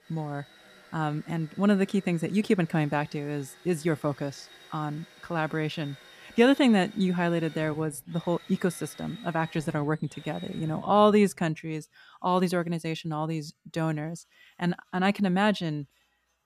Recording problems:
machinery noise; faint; throughout; 20 dB below the speech

